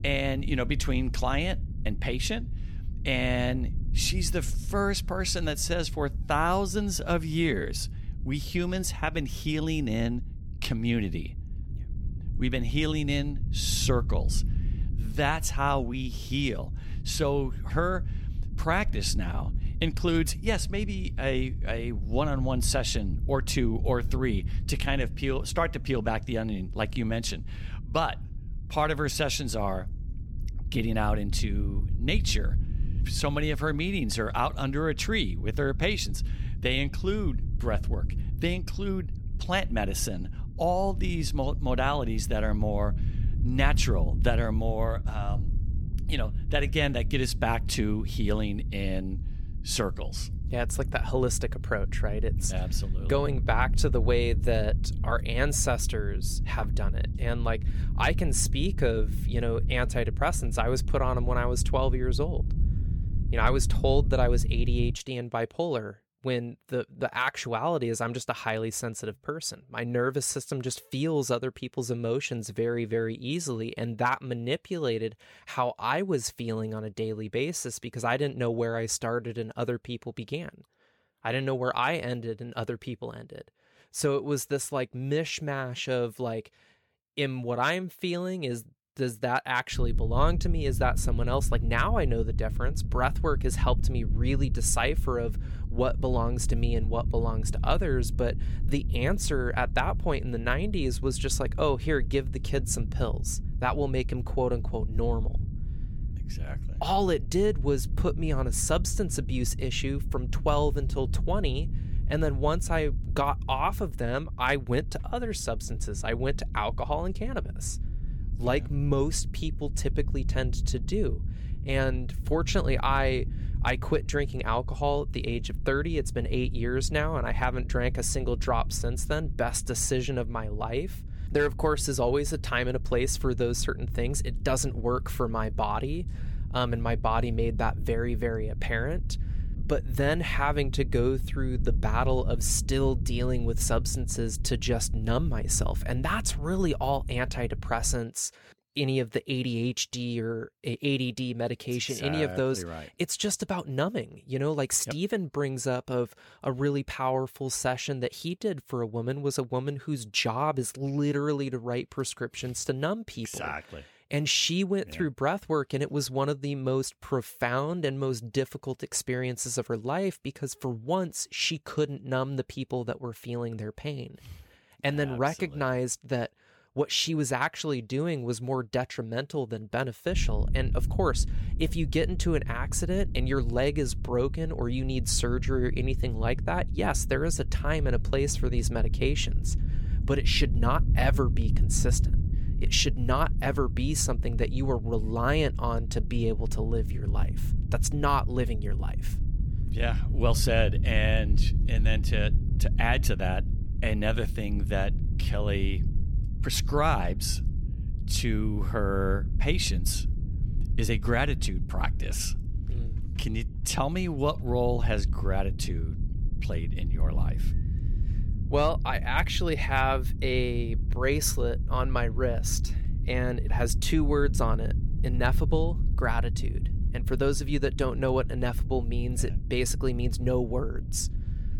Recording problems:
low rumble; noticeable; until 1:05, from 1:30 to 2:28 and from 3:00 on; 15 dB below the speech

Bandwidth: 17 kHz